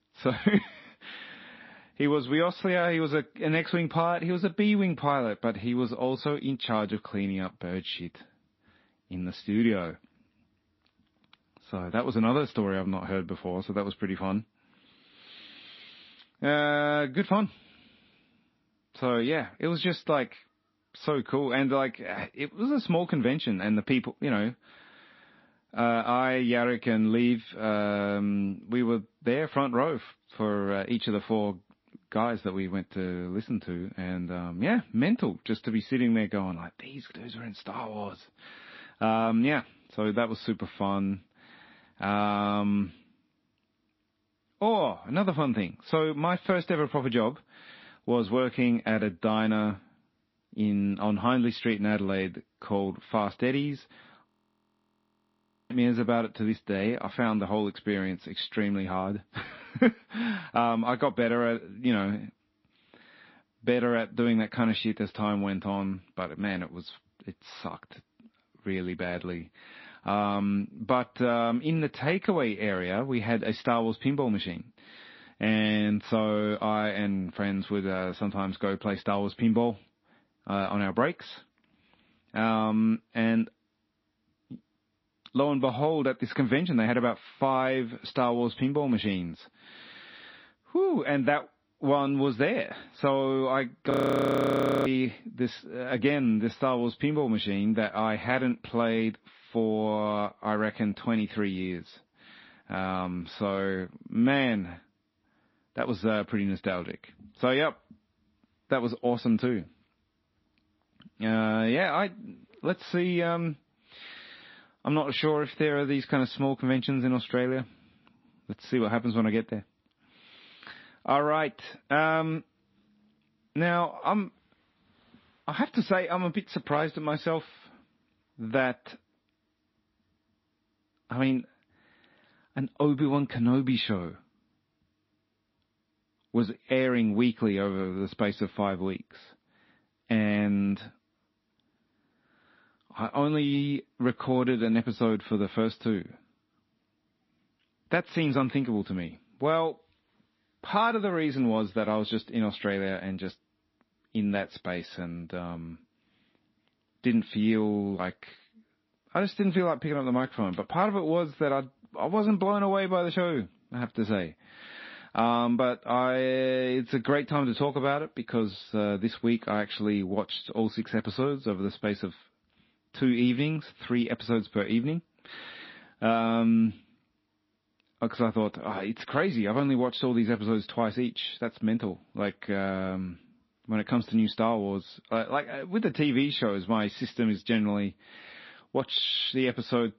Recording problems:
muffled; slightly; fading above 4 kHz
garbled, watery; slightly
audio freezing; at 54 s for 1.5 s and at 1:34 for 1 s

